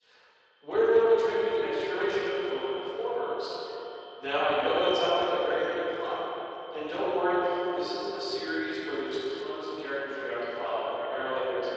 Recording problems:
echo of what is said; strong; throughout; 160 ms later, 7 dB below the speech
room echo; strong; dies away in 3 s
off-mic speech; far
thin; somewhat; fading below 350 Hz
garbled, watery; slightly

